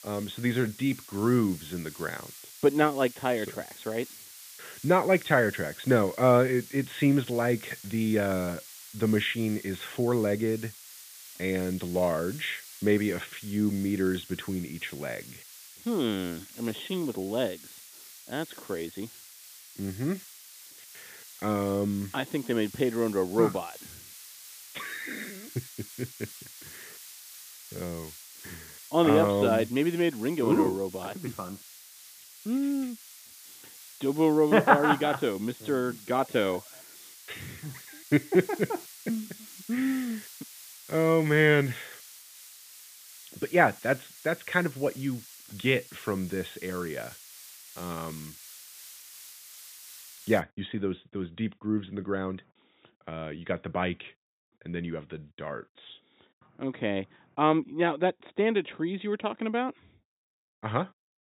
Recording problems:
high frequencies cut off; severe; nothing above 4 kHz
hiss; noticeable; until 50 s; 15 dB below the speech

